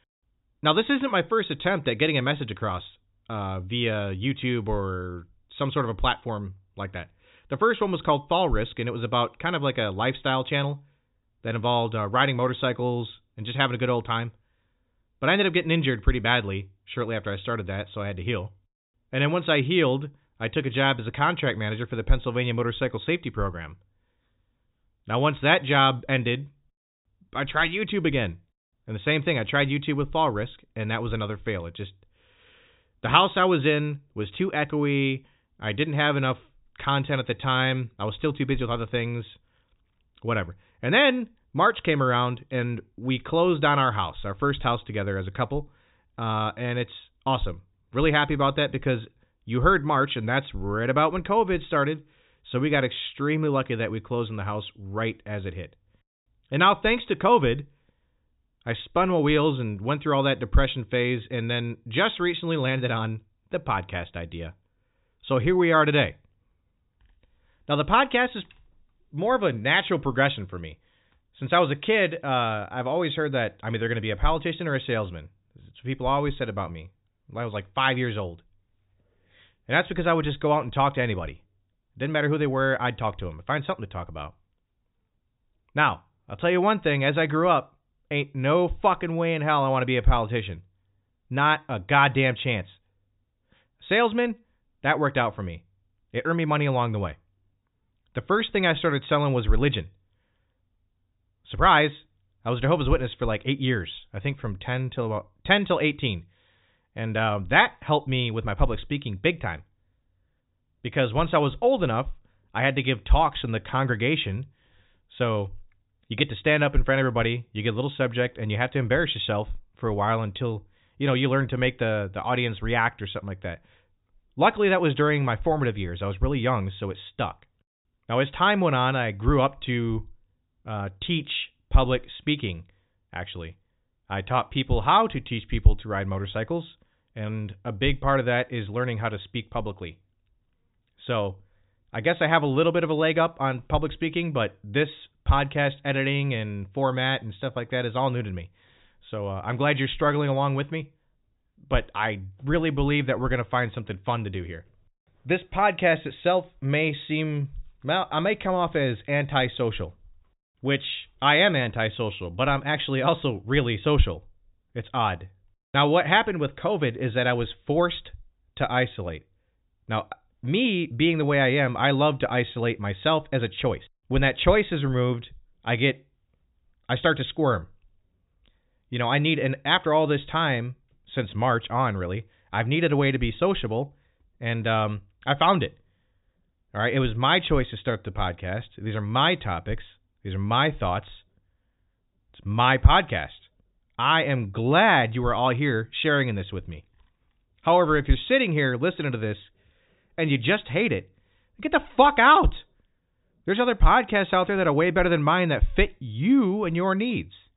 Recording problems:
high frequencies cut off; severe; nothing above 4 kHz

